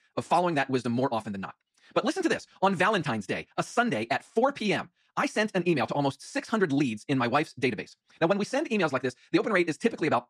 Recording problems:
wrong speed, natural pitch; too fast; 1.7 times normal speed

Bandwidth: 13.5 kHz